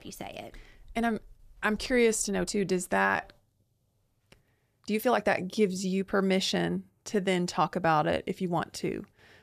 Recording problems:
uneven, jittery; strongly; from 1 to 8.5 s

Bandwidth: 14.5 kHz